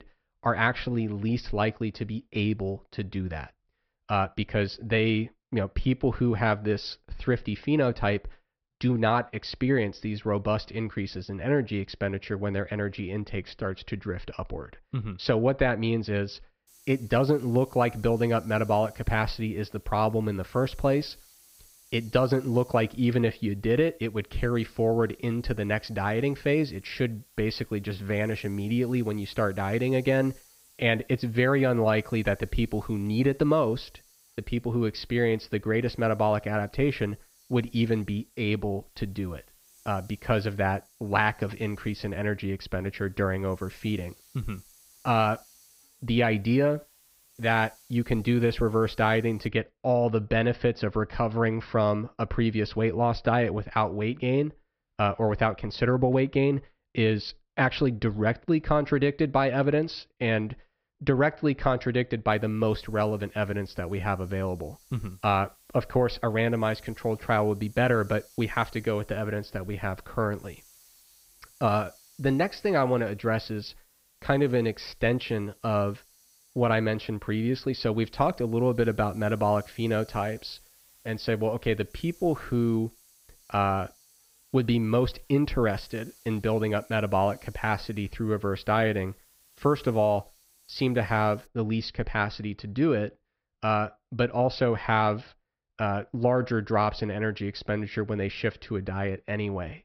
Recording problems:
high frequencies cut off; noticeable; nothing above 5.5 kHz
hiss; faint; from 17 to 49 s and from 1:02 to 1:31; 30 dB below the speech

